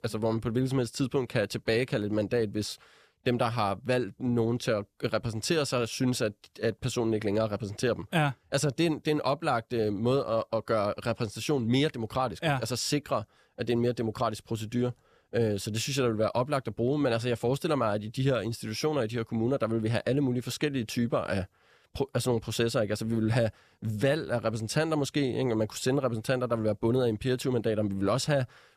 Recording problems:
none

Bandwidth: 14.5 kHz